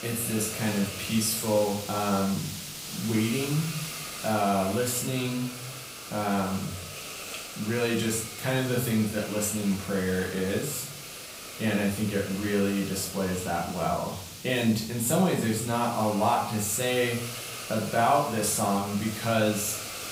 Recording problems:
off-mic speech; far
room echo; noticeable; dies away in 0.5 s
hiss; loud; throughout; 9 dB below the speech

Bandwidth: 15.5 kHz